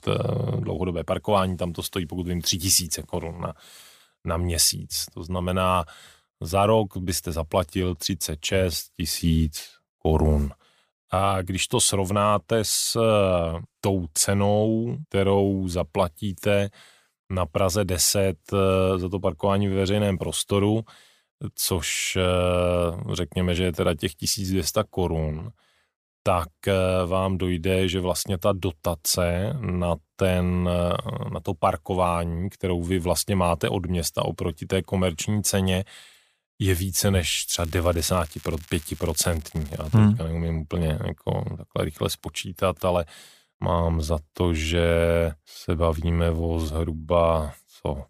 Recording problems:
crackling; faint; from 38 to 40 s; 25 dB below the speech

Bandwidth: 15 kHz